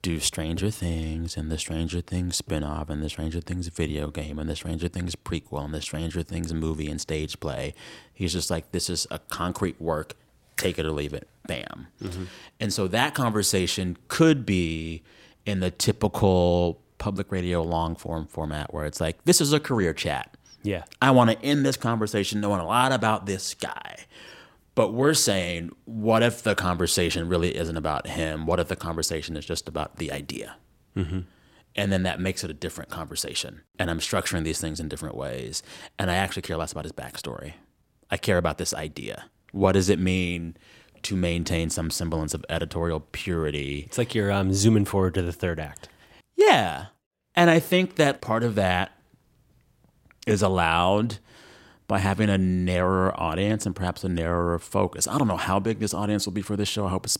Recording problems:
none

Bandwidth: 16 kHz